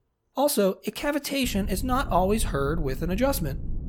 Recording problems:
low rumble; faint; from 1.5 s on; 20 dB below the speech

